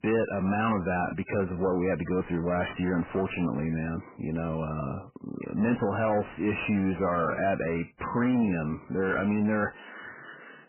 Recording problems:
garbled, watery; badly; nothing above 3 kHz
distortion; slight; 10 dB below the speech

